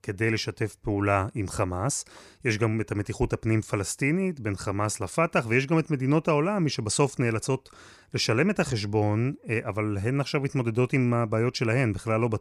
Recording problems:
none

